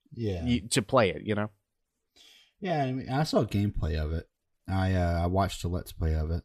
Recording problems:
none

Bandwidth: 14.5 kHz